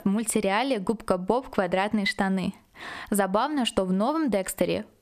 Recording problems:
squashed, flat; somewhat

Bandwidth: 14.5 kHz